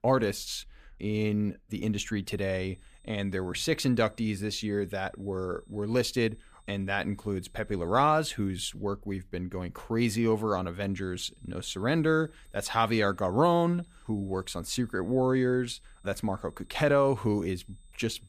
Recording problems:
high-pitched whine; faint; from 2.5 to 8.5 s and from 11 s on; 8 kHz, 35 dB below the speech

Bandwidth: 15 kHz